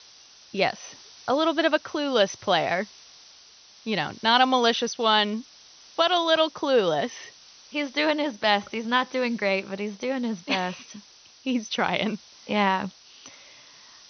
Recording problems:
high frequencies cut off; noticeable; nothing above 6 kHz
hiss; faint; throughout; 25 dB below the speech

